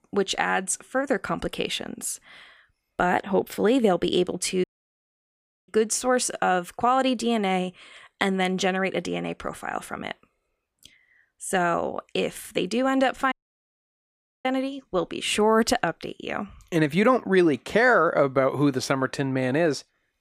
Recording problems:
audio cutting out; at 4.5 s for 1 s and at 13 s for 1 s

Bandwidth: 15 kHz